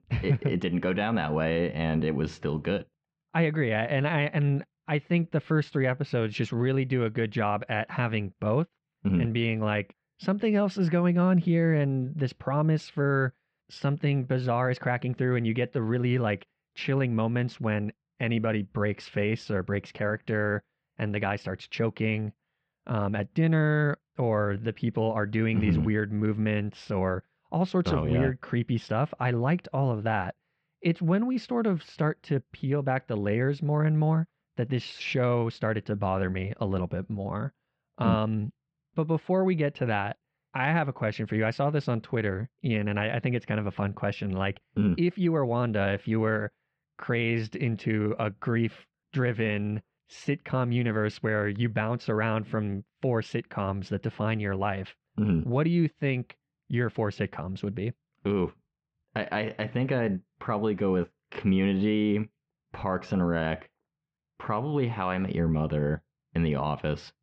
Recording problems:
muffled; very; fading above 3 kHz

